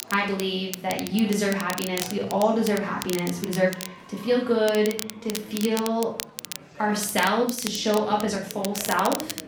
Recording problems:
off-mic speech; far
room echo; slight; dies away in 0.5 s
crackle, like an old record; noticeable; 10 dB below the speech
chatter from many people; faint; throughout; 20 dB below the speech
uneven, jittery; strongly; from 1 to 8.5 s

